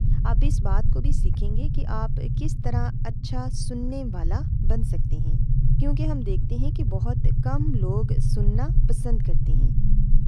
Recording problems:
low rumble; loud; throughout; 3 dB below the speech

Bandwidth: 14.5 kHz